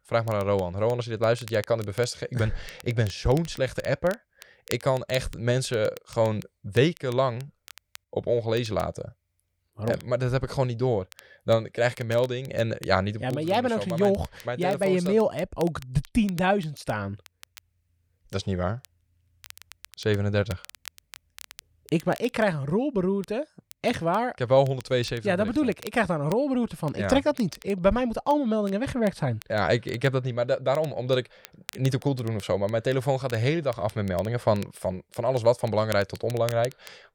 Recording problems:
crackle, like an old record; faint; 20 dB below the speech

